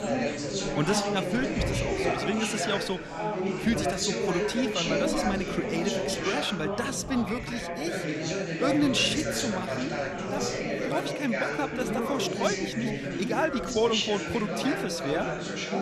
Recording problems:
chatter from many people; very loud; throughout; as loud as the speech

